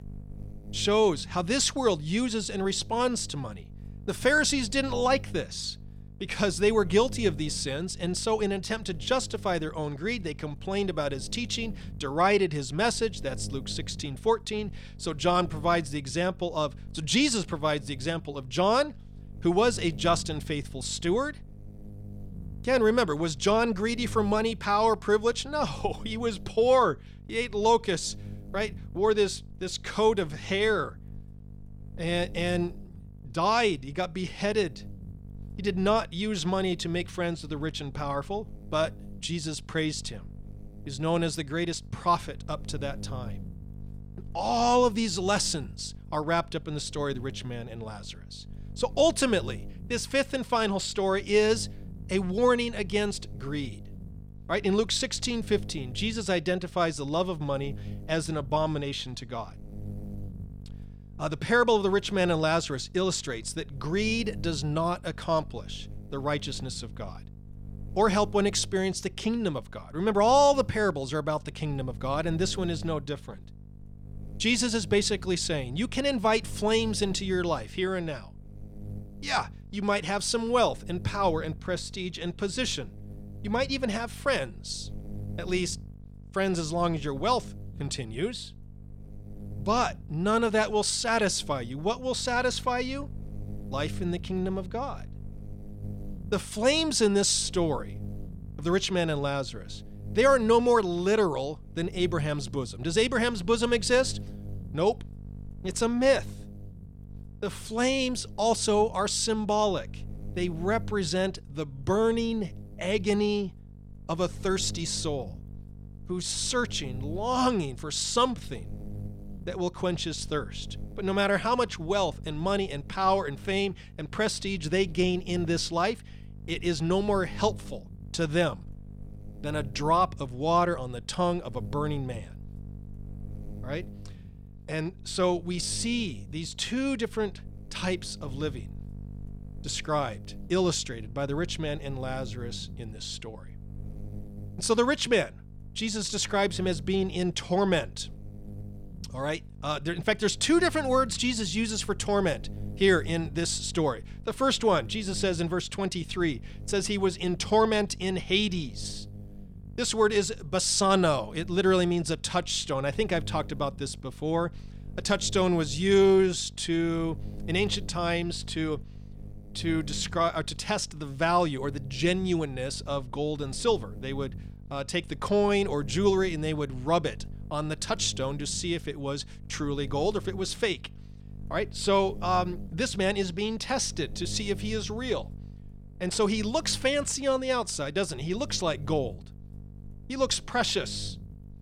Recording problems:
electrical hum; faint; throughout; 50 Hz, 25 dB below the speech

